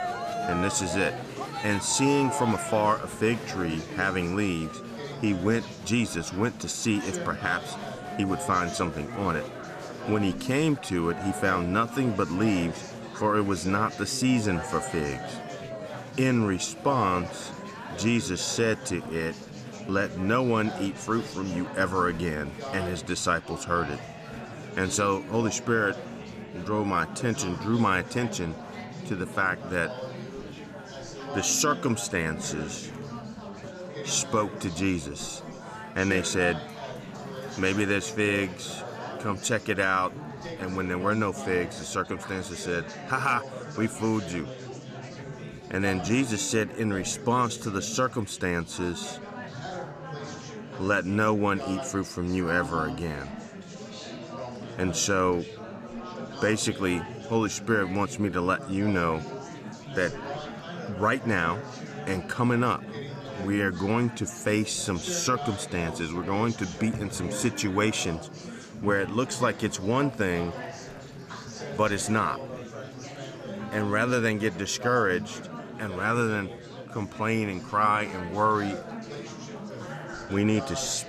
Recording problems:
murmuring crowd; noticeable; throughout; 10 dB below the speech

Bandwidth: 14.5 kHz